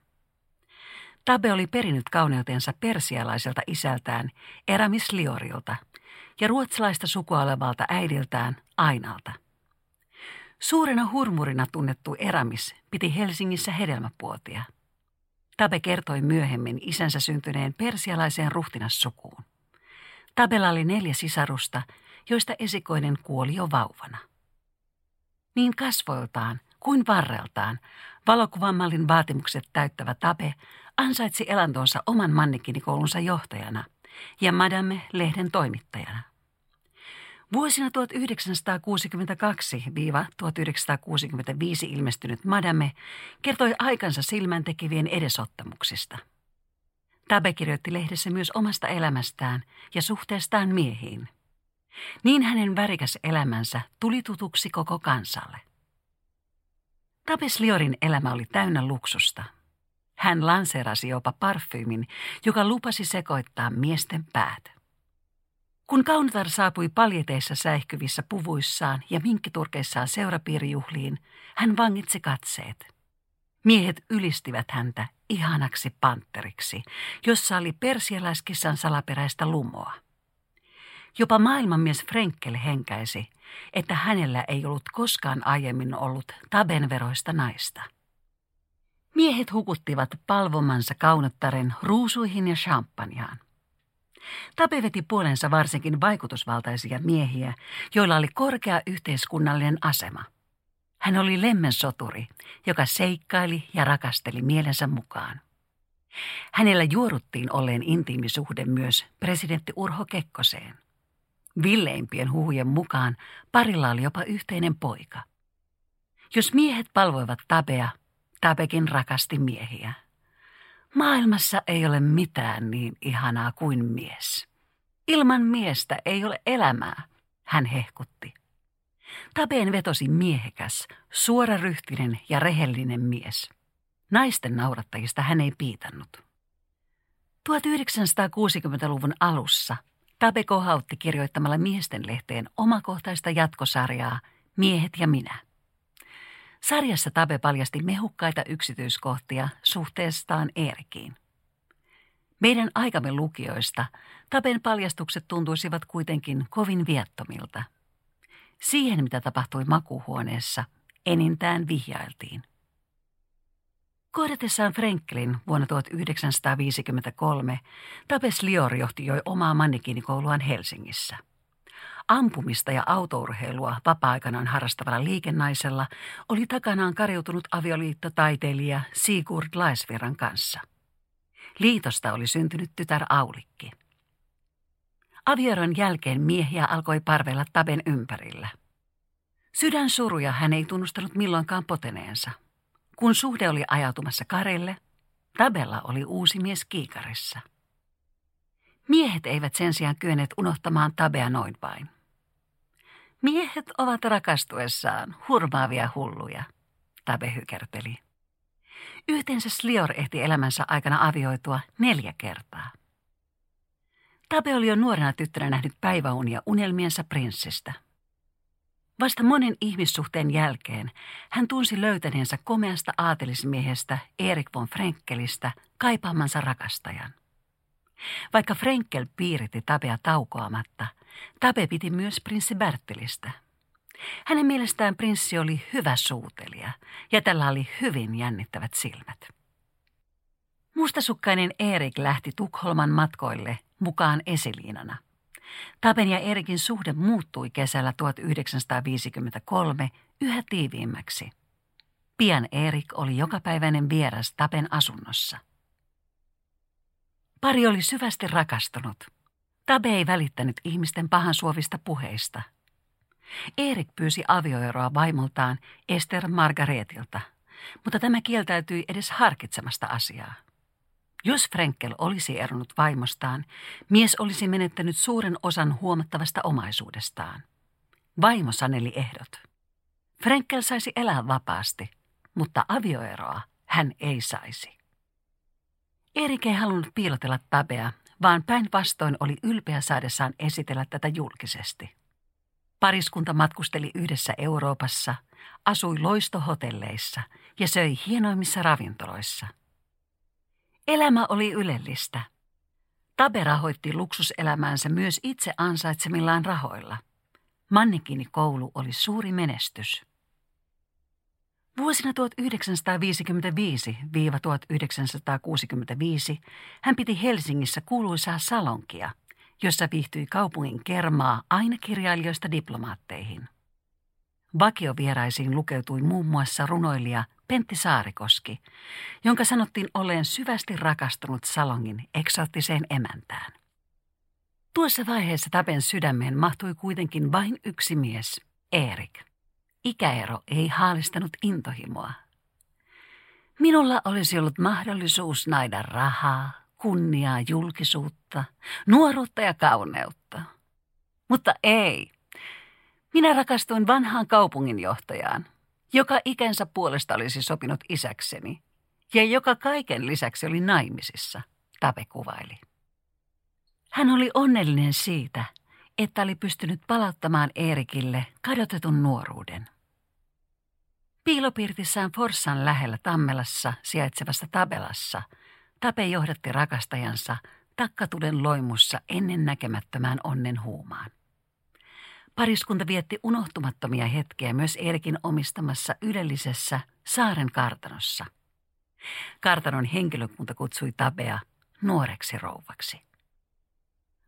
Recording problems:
none

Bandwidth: 16 kHz